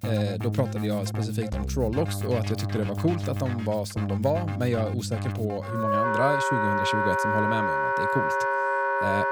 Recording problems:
background music; very loud; throughout; 2 dB above the speech

